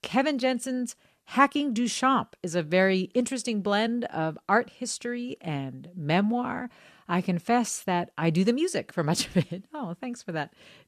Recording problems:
none

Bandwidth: 13.5 kHz